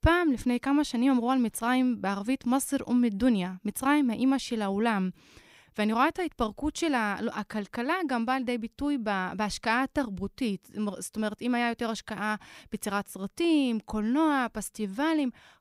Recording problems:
none

